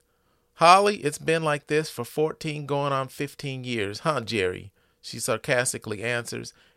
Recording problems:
none

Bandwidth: 16 kHz